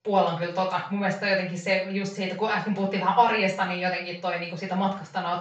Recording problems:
off-mic speech; far
room echo; noticeable; dies away in 0.4 s
high frequencies cut off; noticeable; nothing above 8 kHz

